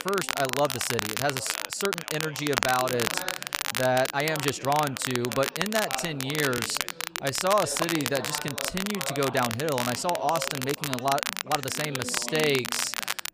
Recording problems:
crackle, like an old record; loud; 3 dB below the speech
background chatter; noticeable; throughout; 4 voices, 15 dB below the speech
uneven, jittery; strongly; from 0.5 to 13 s

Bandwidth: 15 kHz